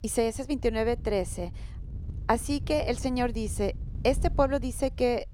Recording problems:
wind noise on the microphone; occasional gusts; 25 dB below the speech

